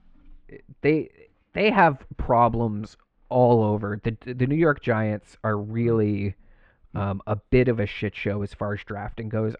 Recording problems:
muffled; very; fading above 3 kHz

